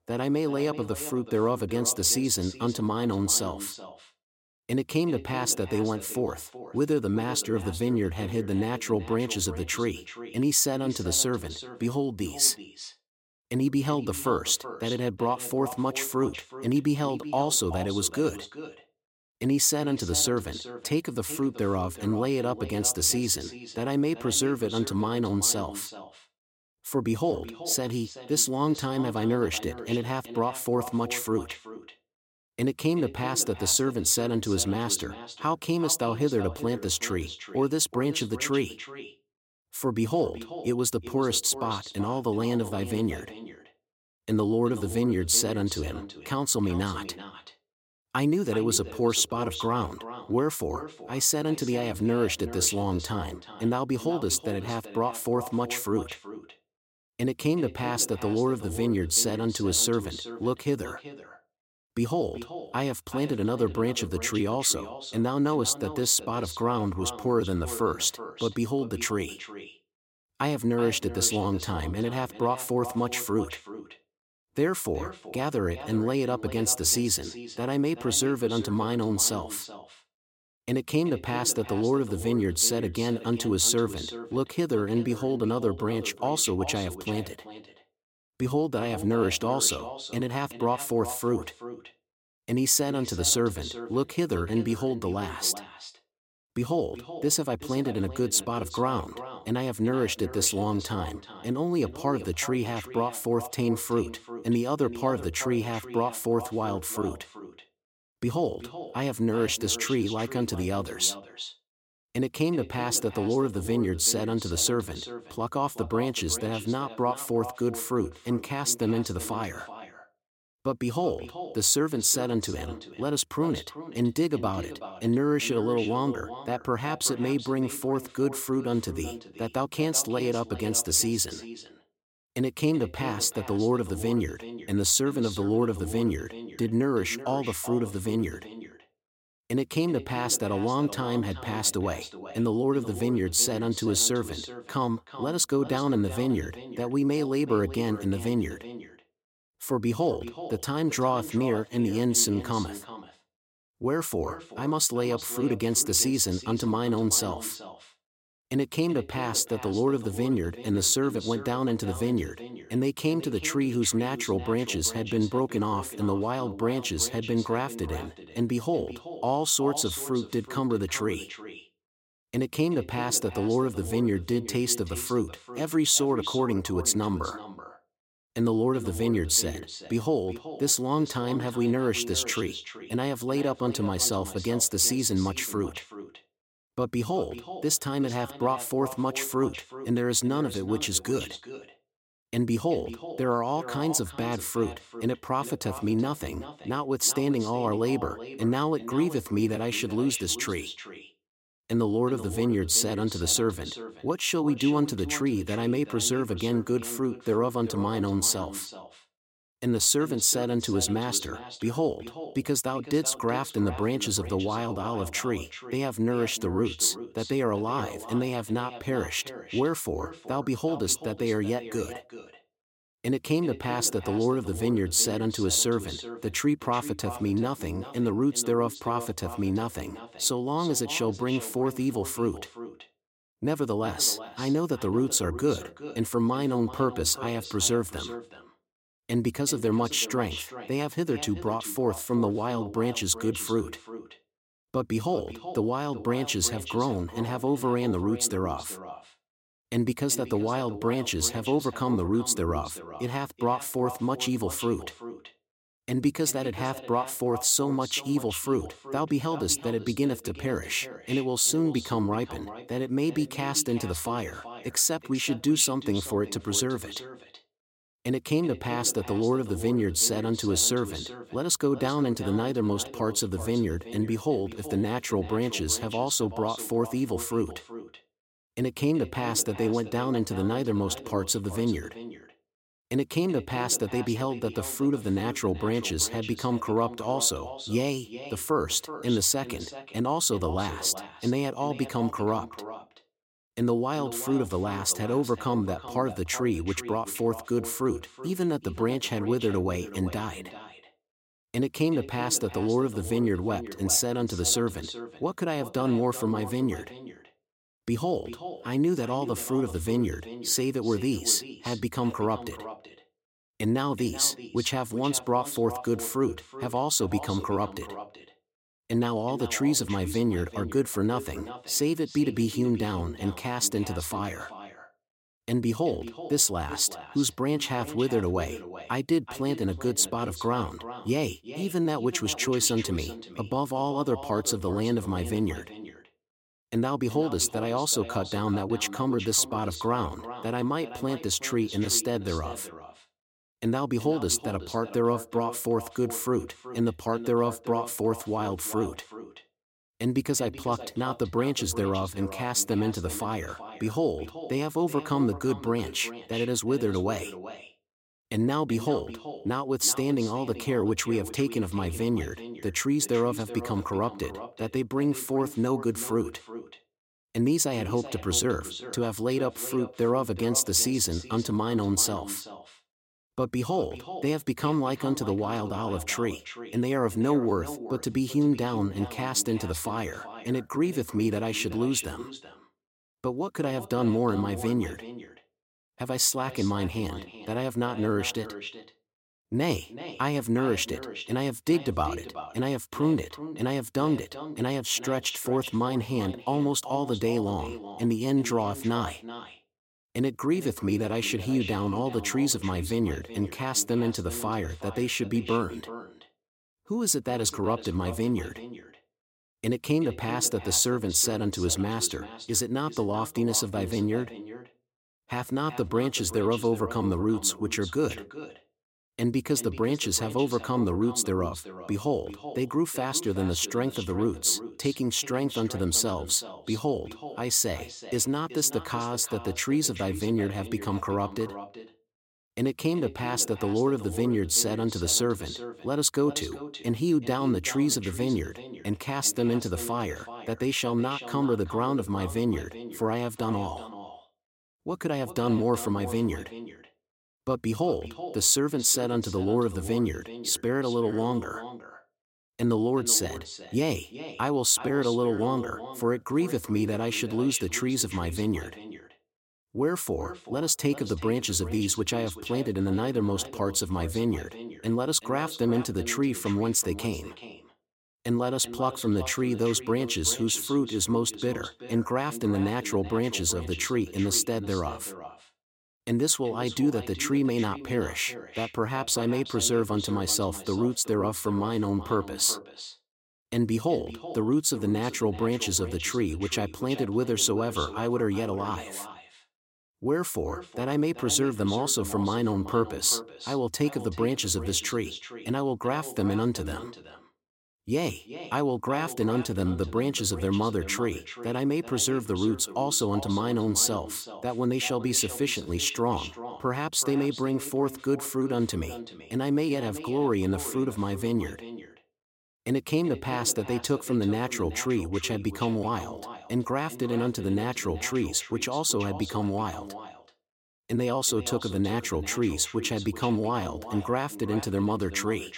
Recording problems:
echo of what is said; noticeable; throughout; 380 ms later, 15 dB below the speech

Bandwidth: 16.5 kHz